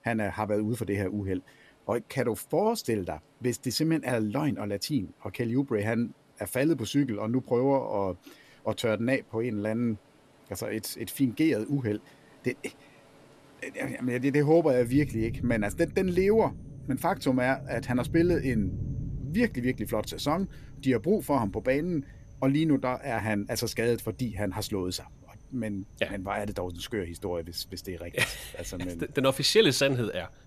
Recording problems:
rain or running water; noticeable; throughout; 15 dB below the speech

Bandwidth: 14 kHz